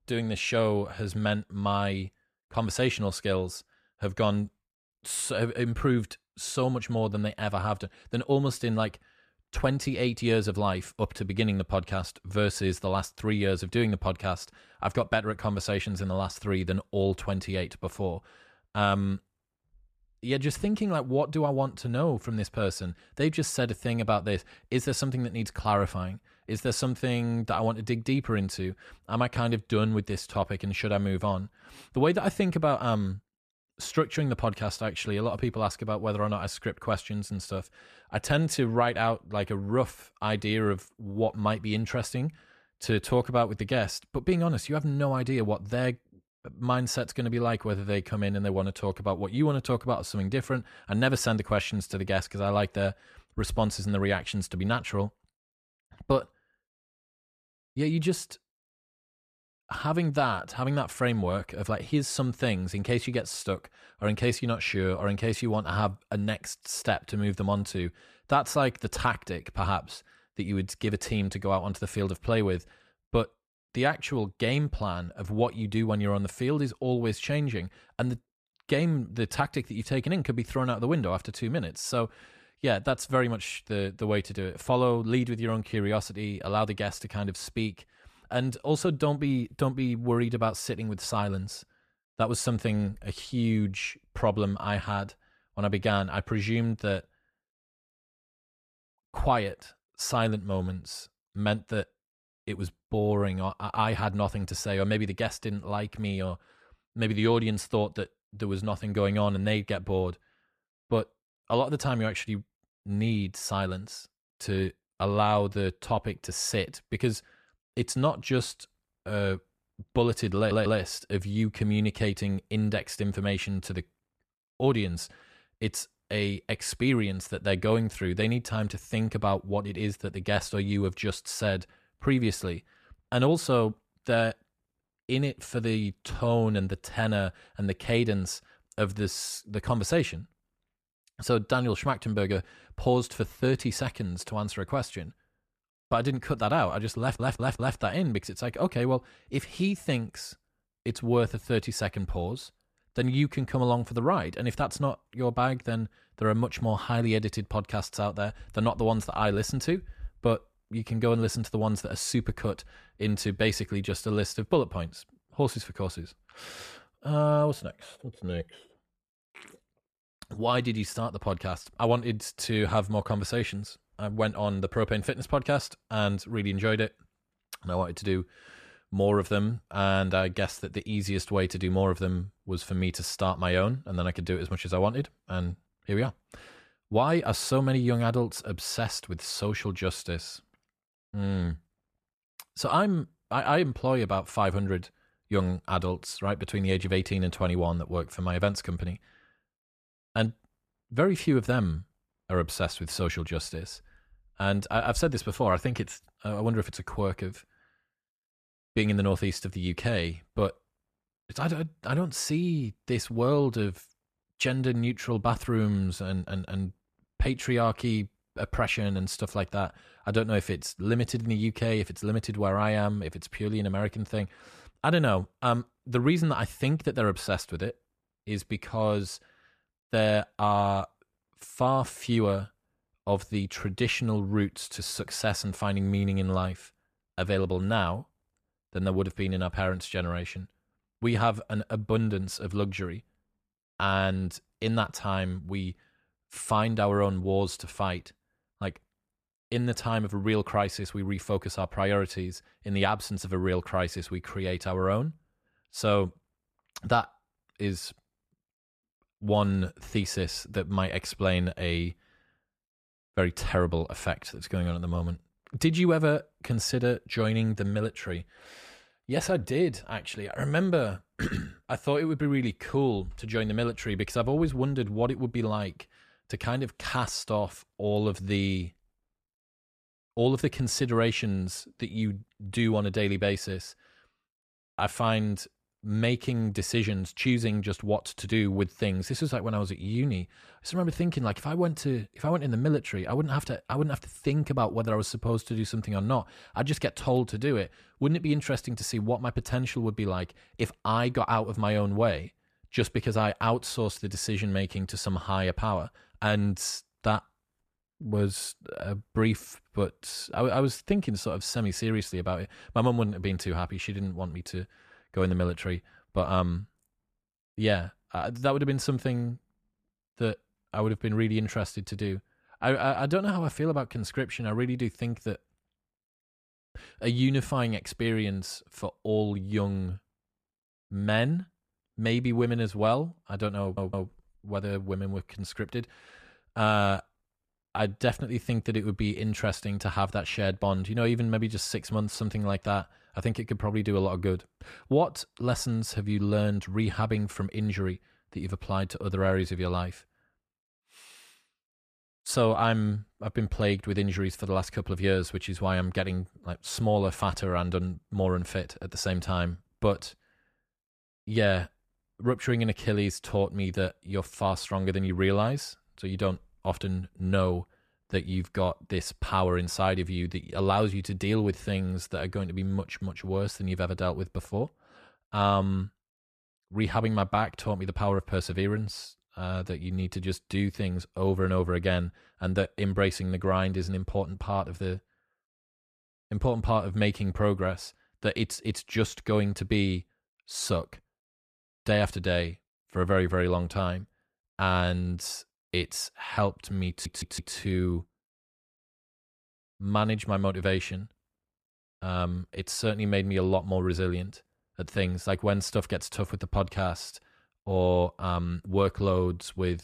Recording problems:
audio stuttering; 4 times, first at 2:00

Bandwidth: 14.5 kHz